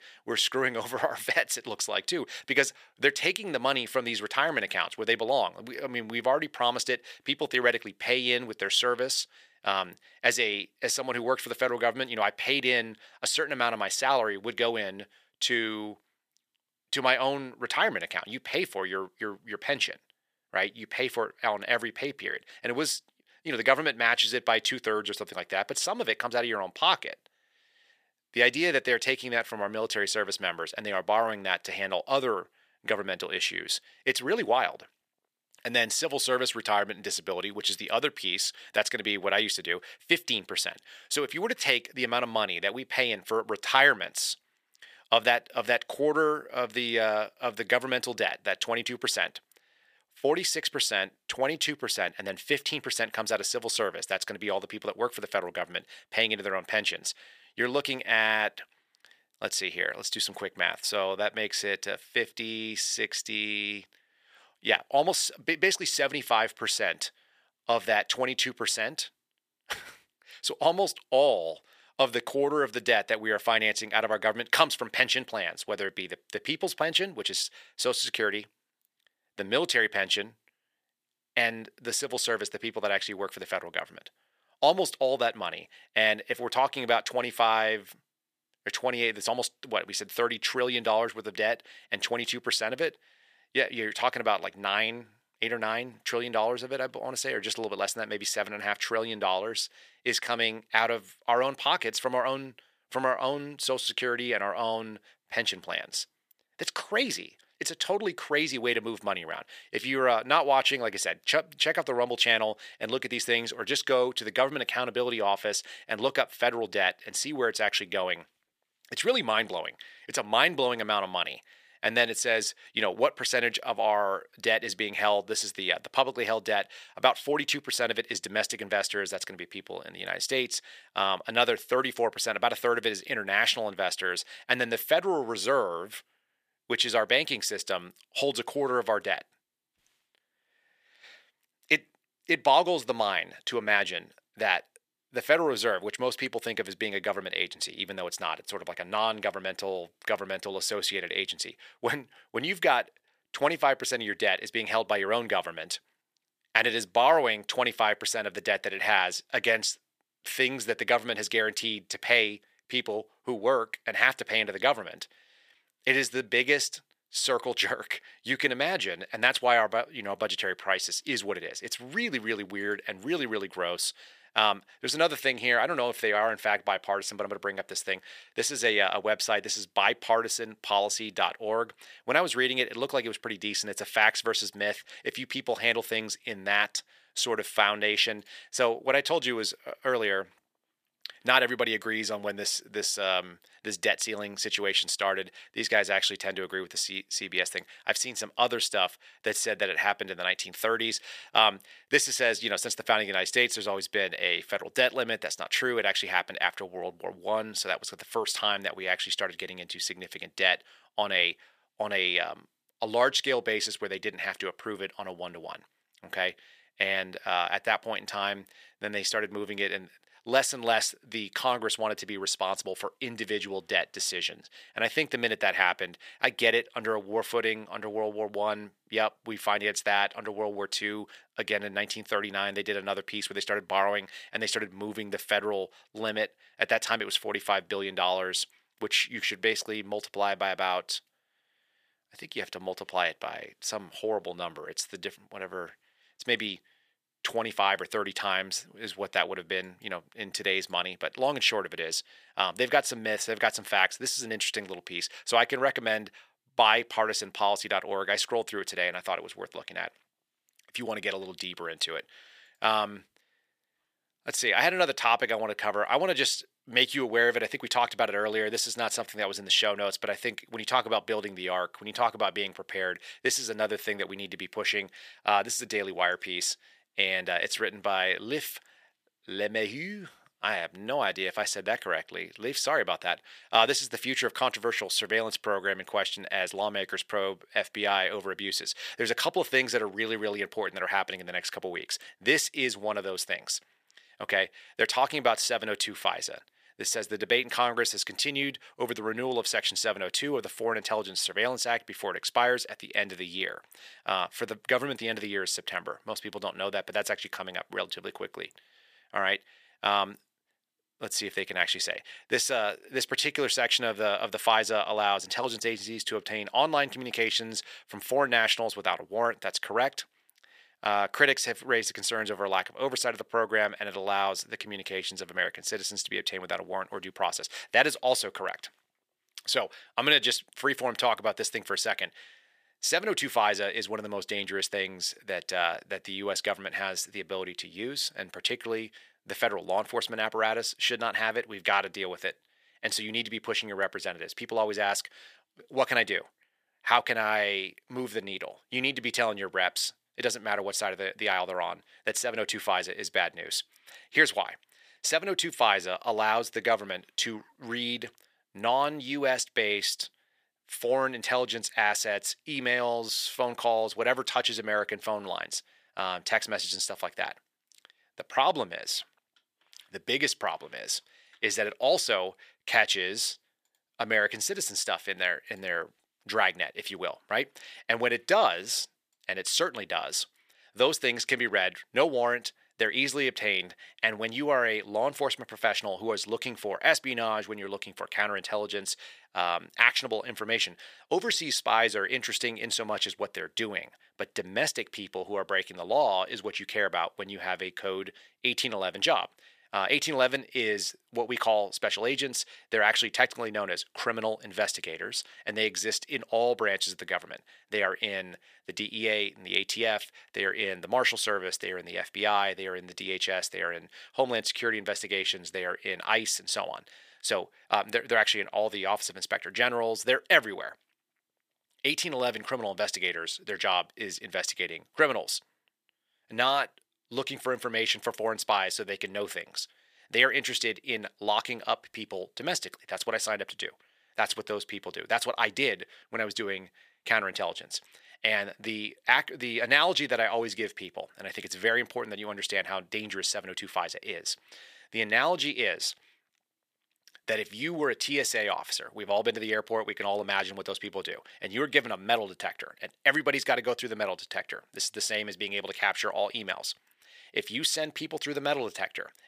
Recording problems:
thin; very; fading below 550 Hz

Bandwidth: 15 kHz